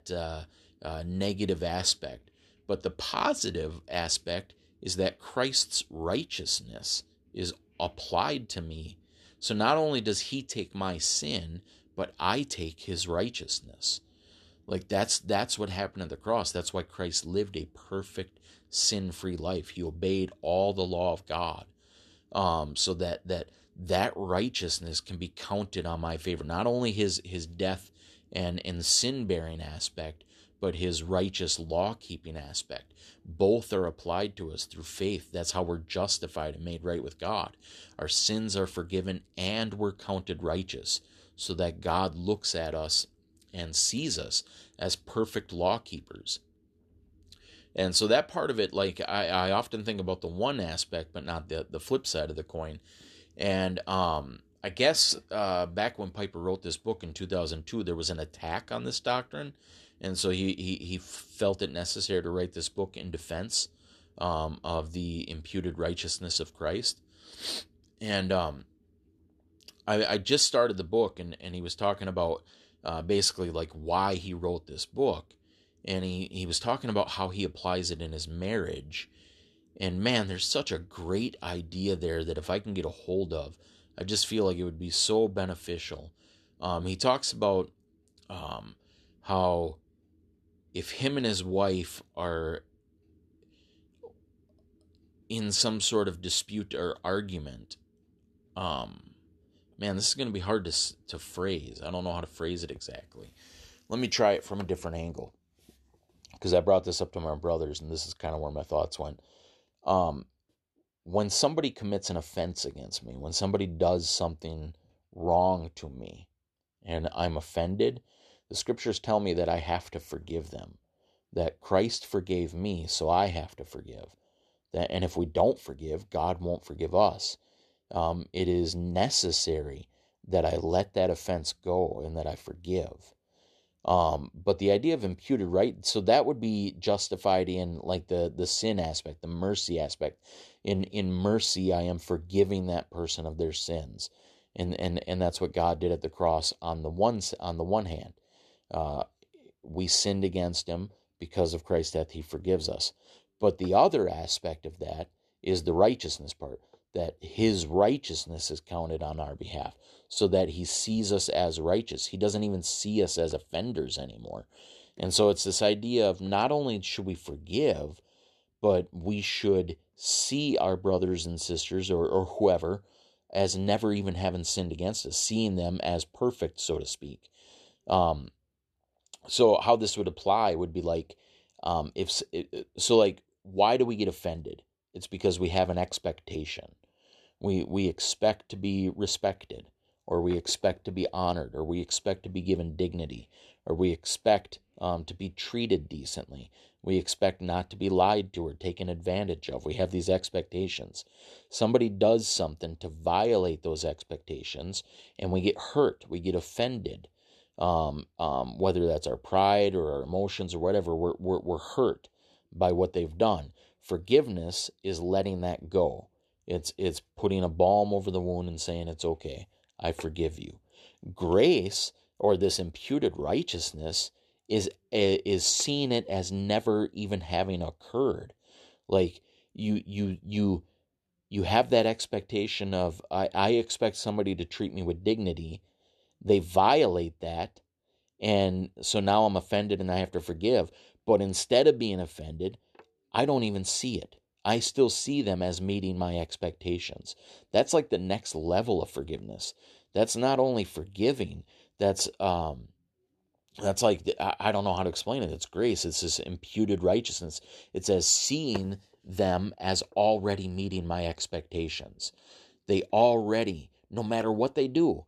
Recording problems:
none

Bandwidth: 13.5 kHz